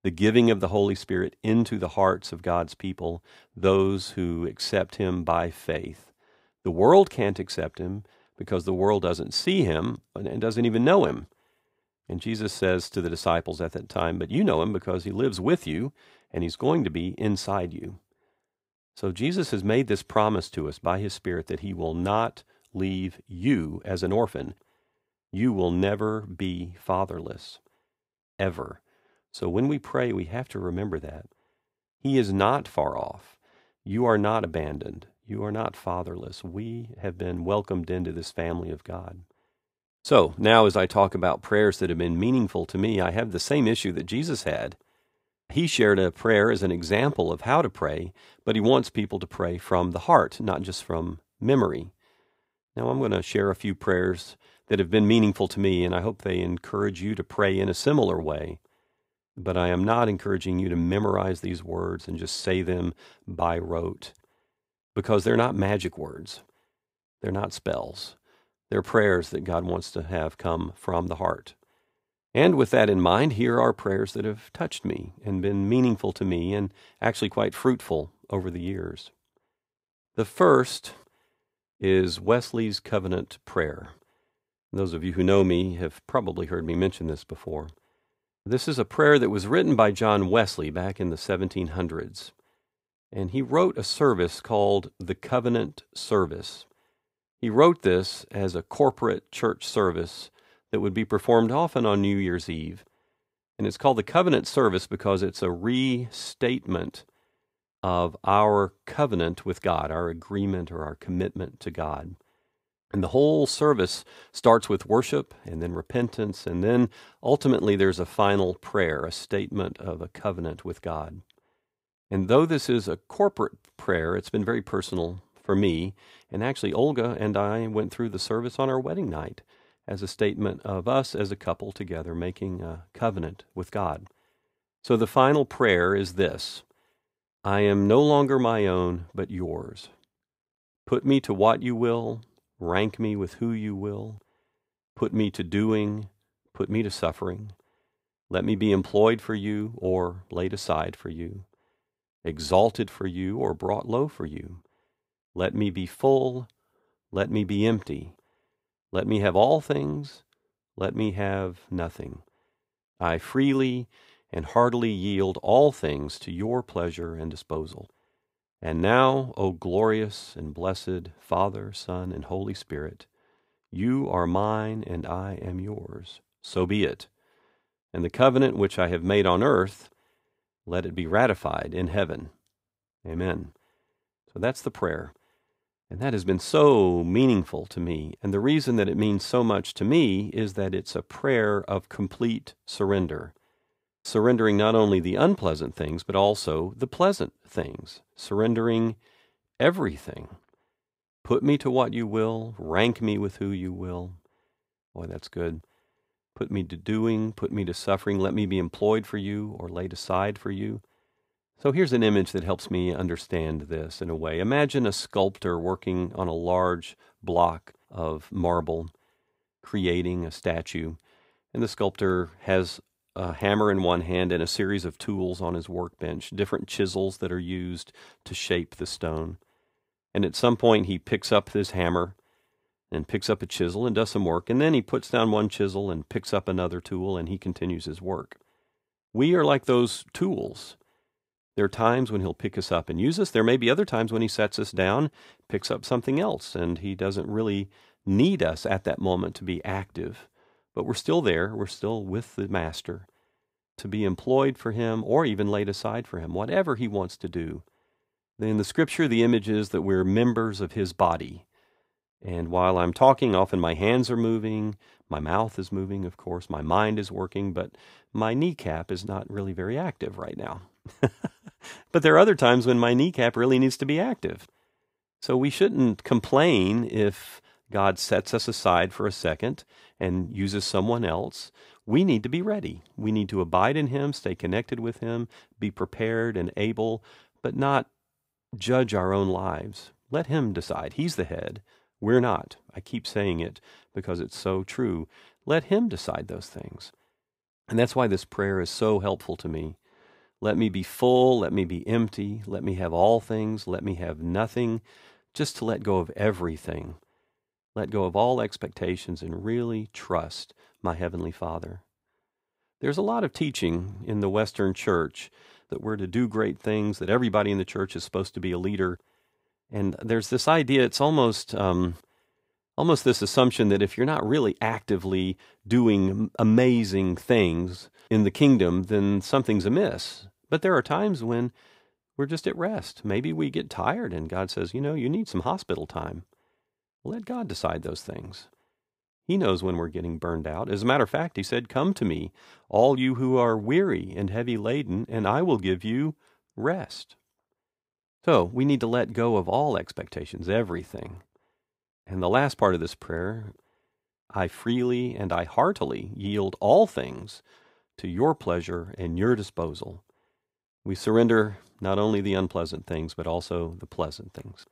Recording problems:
none

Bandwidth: 15.5 kHz